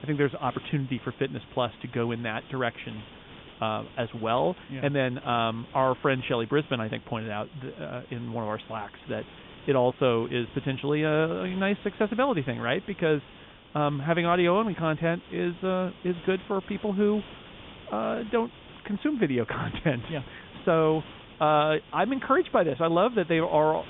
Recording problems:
high frequencies cut off; severe; nothing above 3.5 kHz
hiss; noticeable; throughout; 20 dB below the speech

